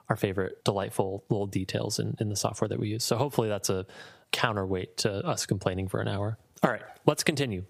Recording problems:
squashed, flat; somewhat

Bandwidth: 15 kHz